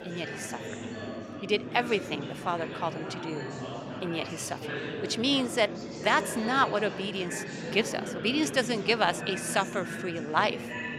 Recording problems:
chatter from many people; loud; throughout; 8 dB below the speech

